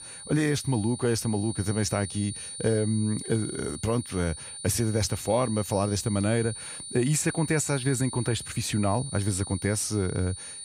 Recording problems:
high-pitched whine; loud; throughout; 9.5 kHz, 9 dB below the speech

